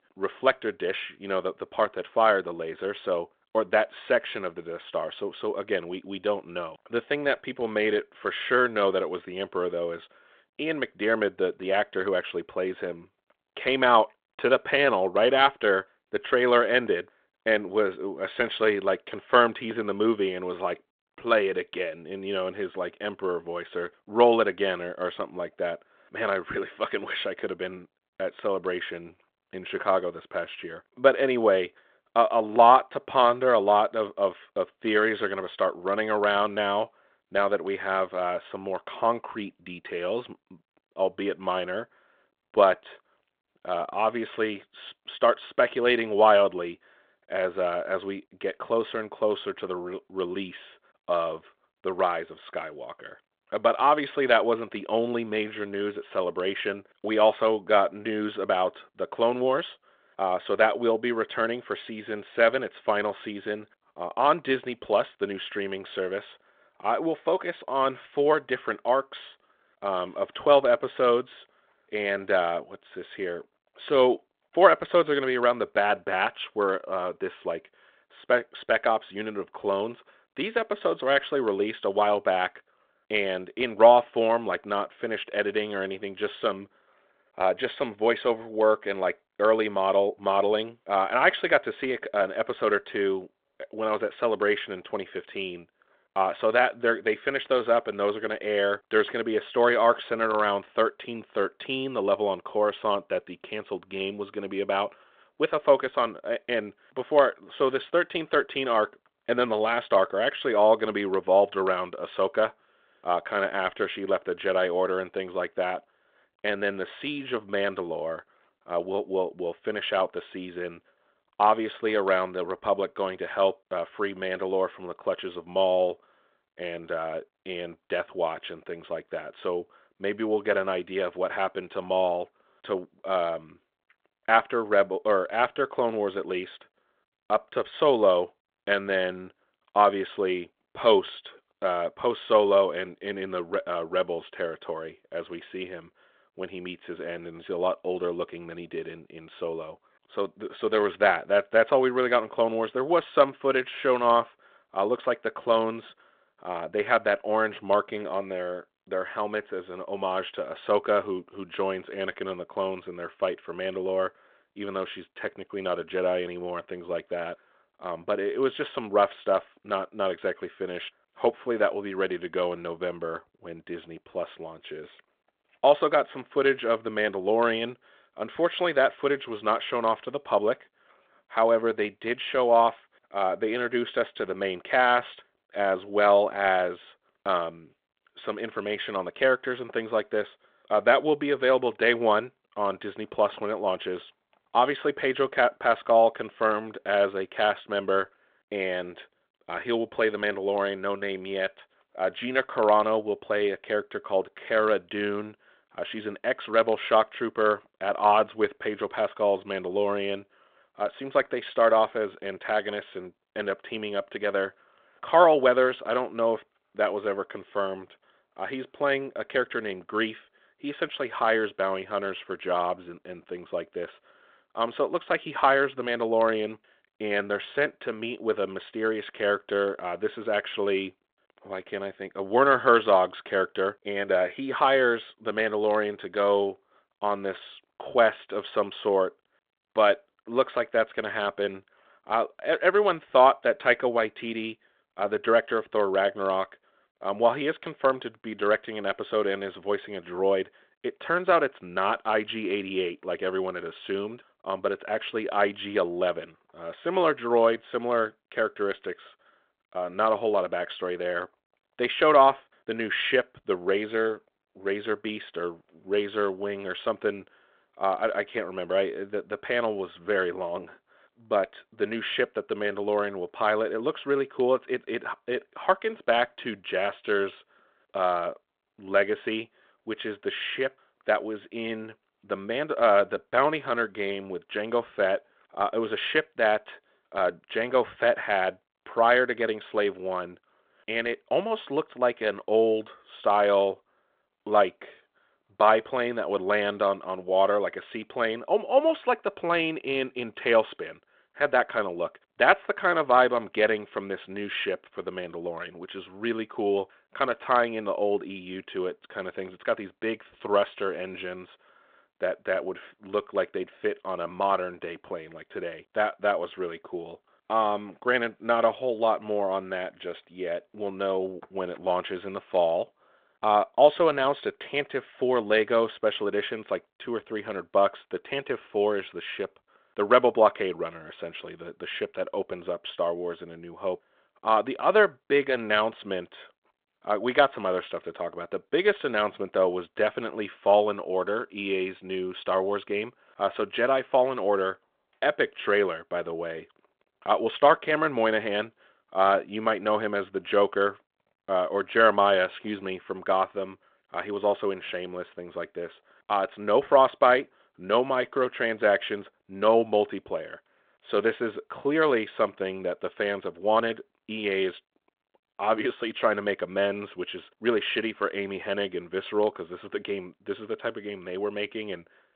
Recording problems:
phone-call audio

